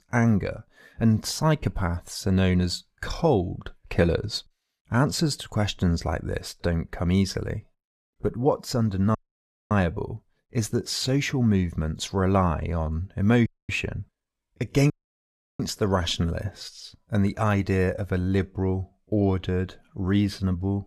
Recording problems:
audio cutting out; at 9 s for 0.5 s, at 13 s and at 15 s for 0.5 s

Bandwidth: 14 kHz